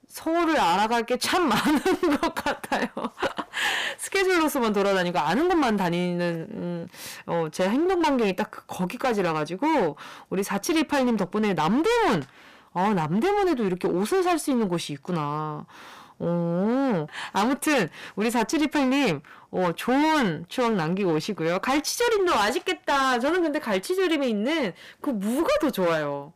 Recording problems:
distortion; heavy; 17% of the sound clipped

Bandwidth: 15 kHz